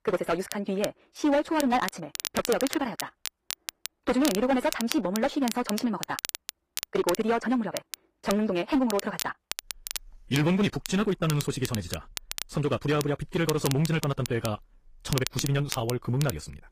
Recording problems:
wrong speed, natural pitch; too fast; 1.8 times normal speed
distortion; slight; 5% of the sound clipped
garbled, watery; slightly; nothing above 15 kHz
crackle, like an old record; loud; 9 dB below the speech

